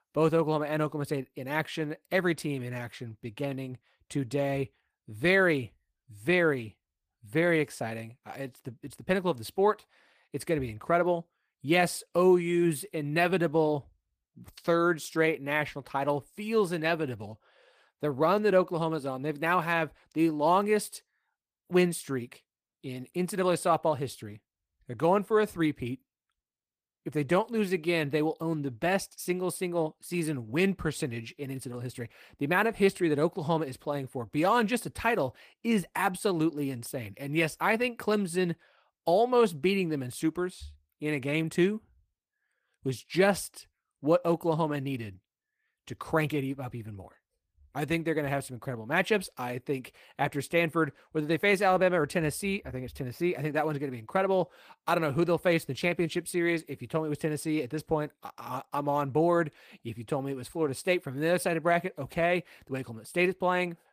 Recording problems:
garbled, watery; slightly; nothing above 15 kHz

